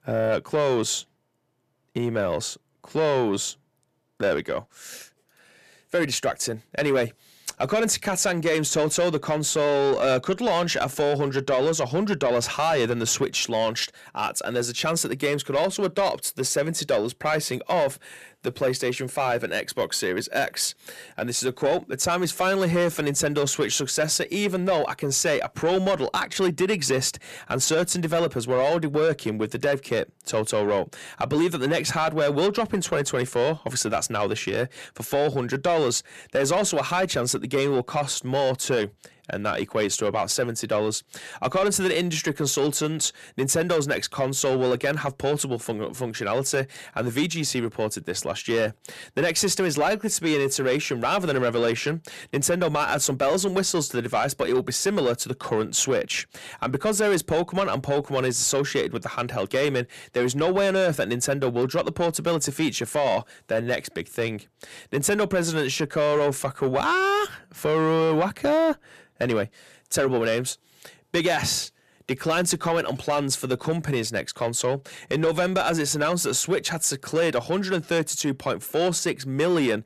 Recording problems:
distortion; slight; 10 dB below the speech

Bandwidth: 14.5 kHz